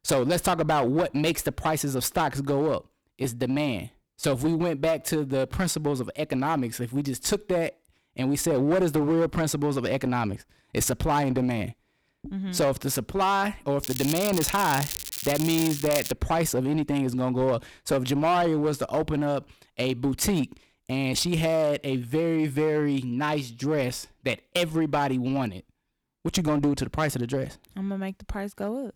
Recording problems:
distortion; slight; 8% of the sound clipped
crackling; loud; from 14 to 16 s; 5 dB below the speech

